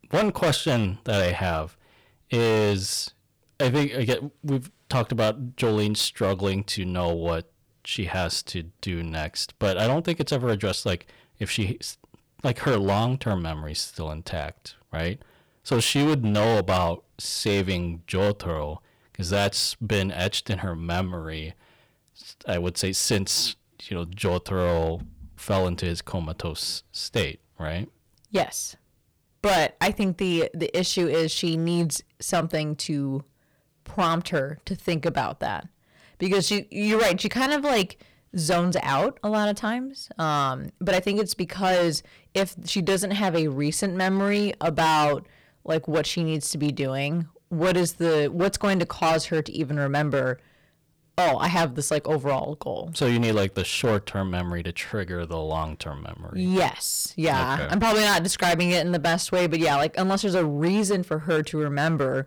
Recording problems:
distortion; heavy; 9% of the sound clipped

